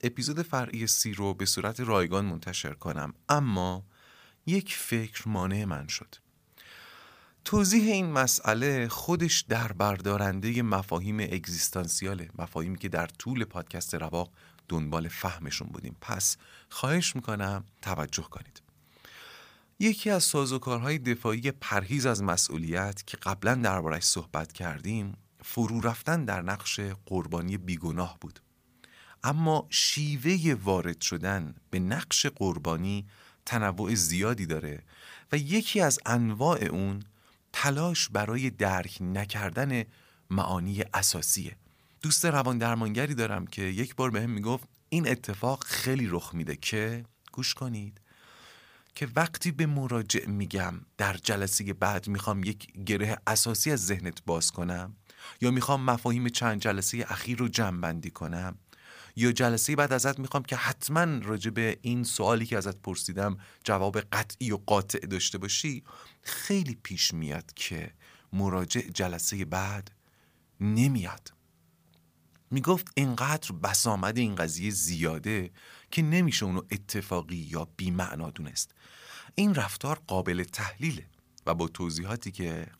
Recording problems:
none

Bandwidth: 15 kHz